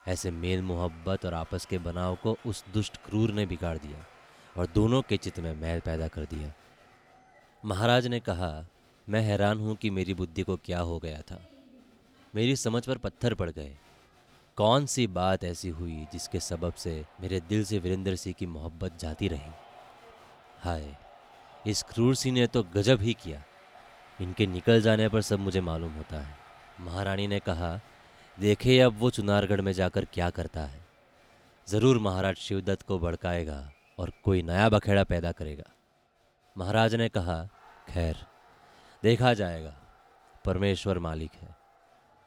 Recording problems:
crowd noise; faint; throughout; 25 dB below the speech

